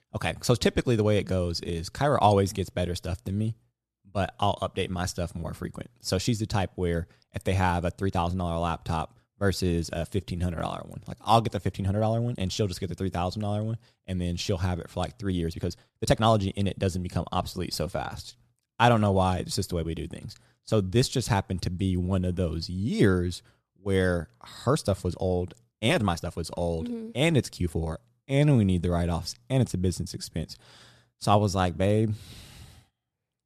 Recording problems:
uneven, jittery; strongly; from 8 to 29 s

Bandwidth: 13.5 kHz